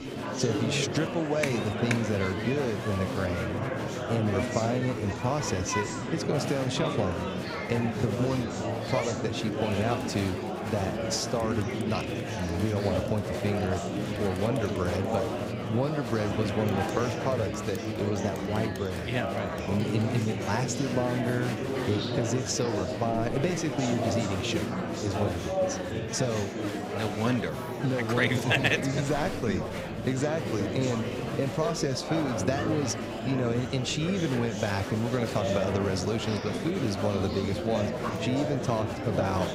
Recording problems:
murmuring crowd; loud; throughout; 2 dB below the speech

